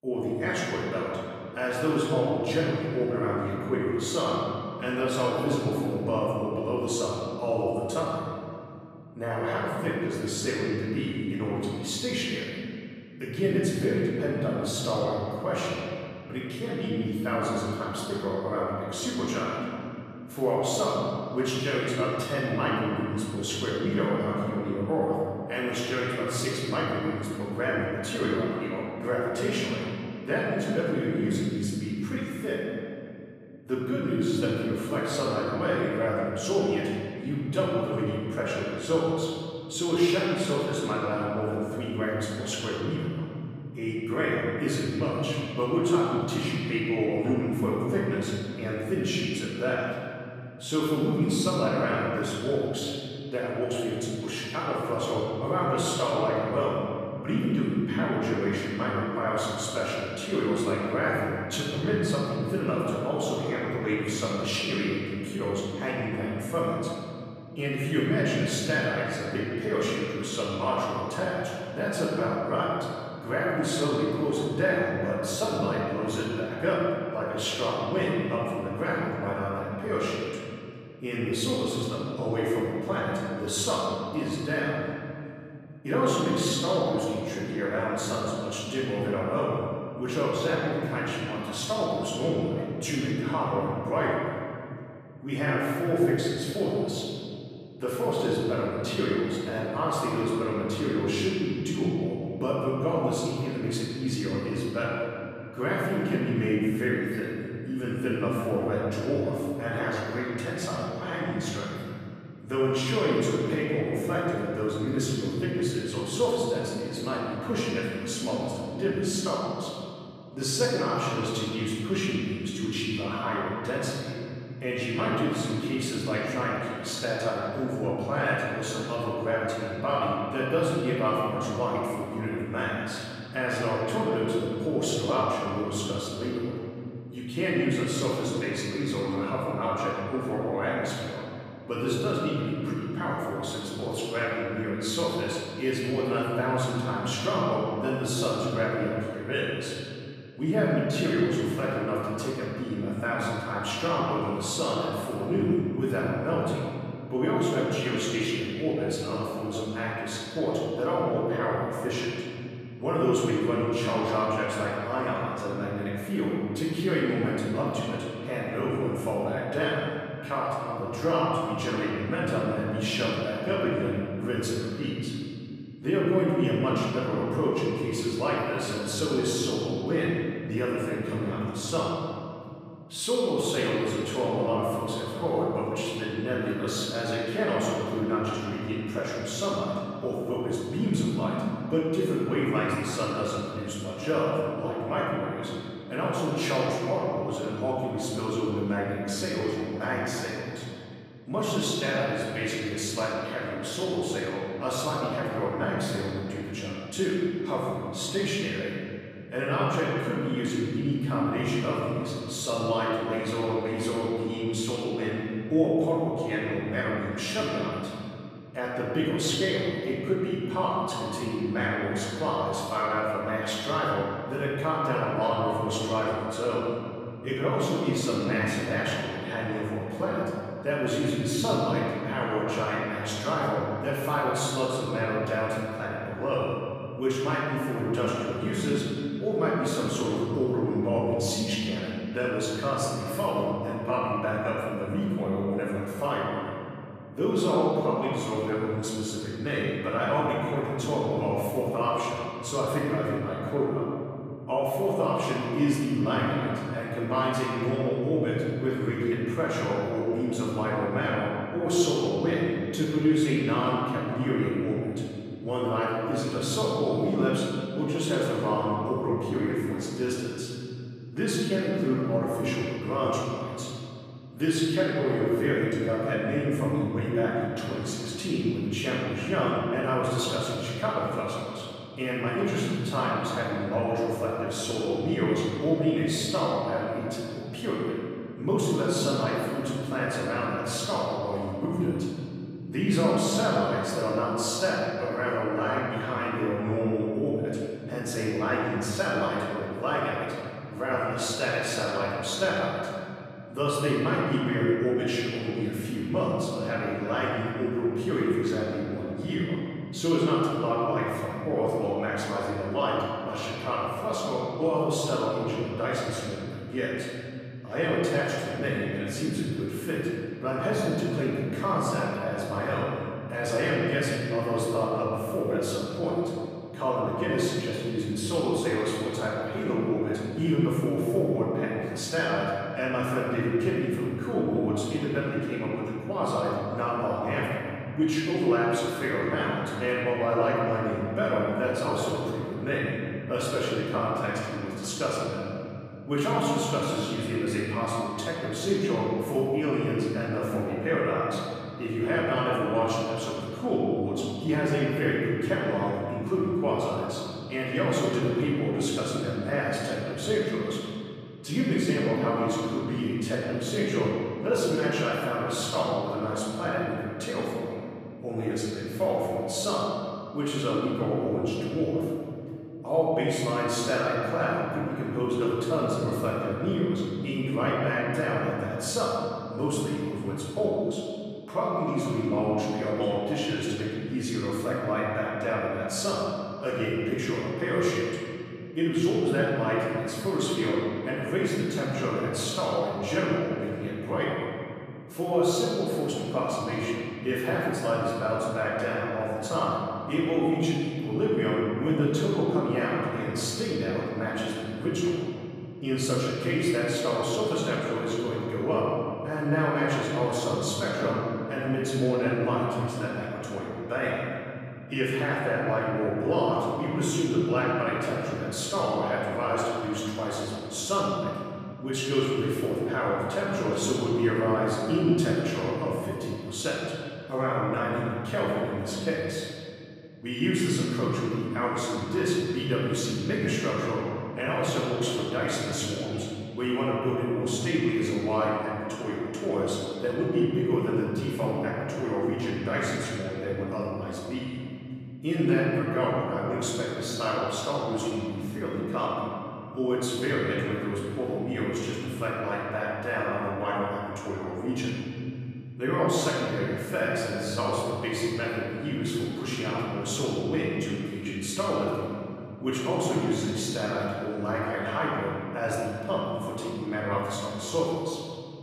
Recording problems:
room echo; strong; dies away in 2.6 s
off-mic speech; far

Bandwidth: 15 kHz